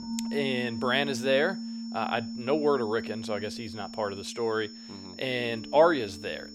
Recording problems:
background music; loud; throughout; 10 dB below the speech
high-pitched whine; noticeable; throughout; 5.5 kHz, 15 dB below the speech

